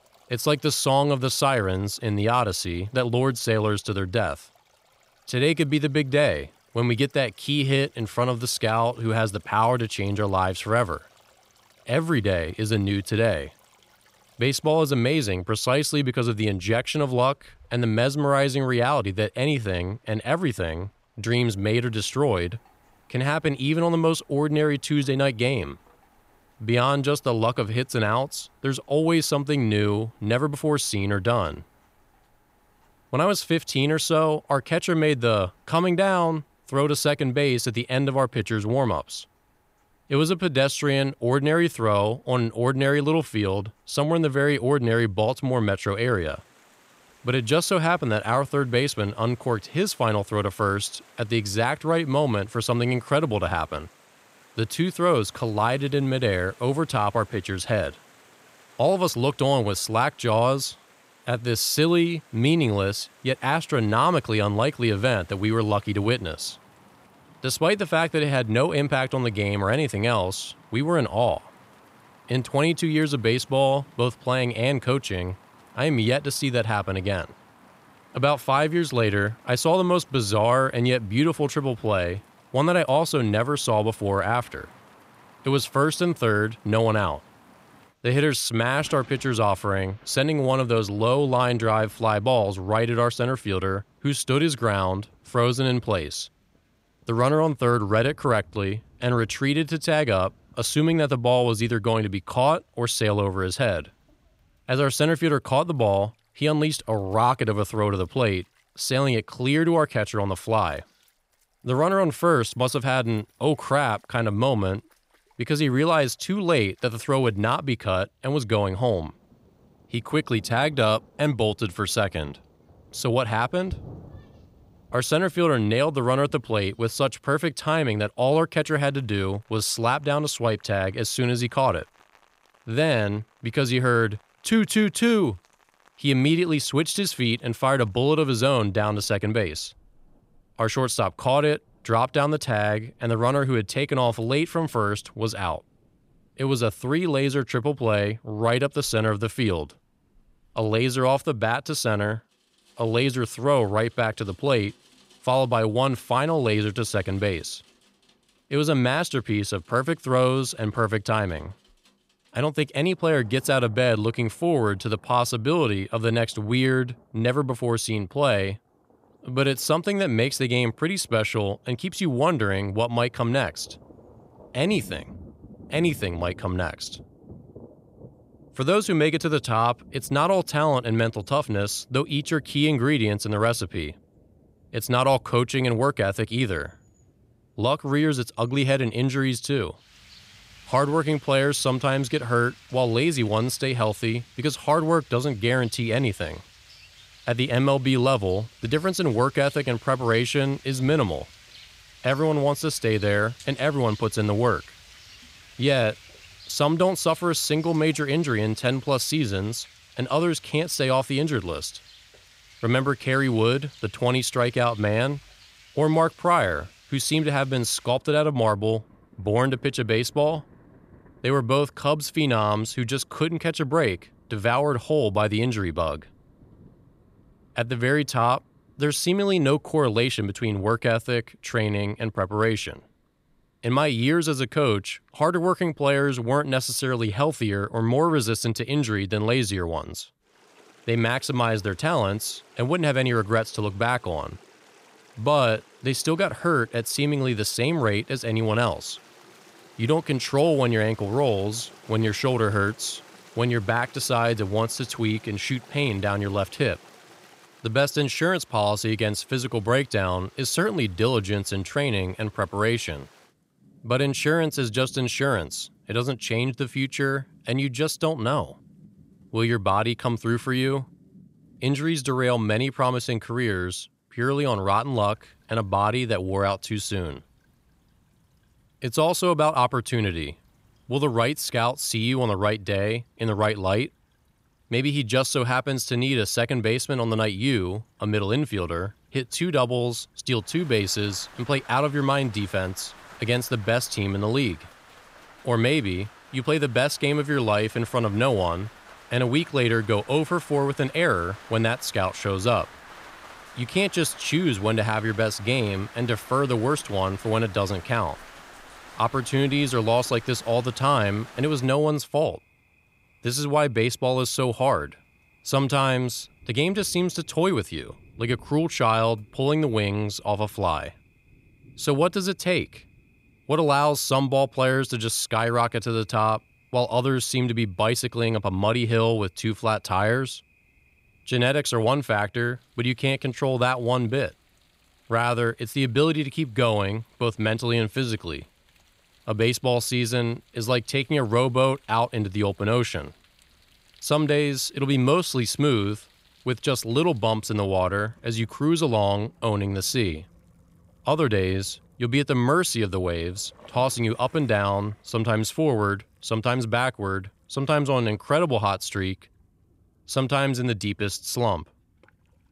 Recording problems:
rain or running water; faint; throughout; 25 dB below the speech

